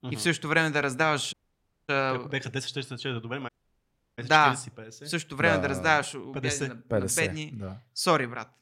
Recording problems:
audio cutting out; at 1.5 s for 0.5 s and at 3.5 s for 0.5 s

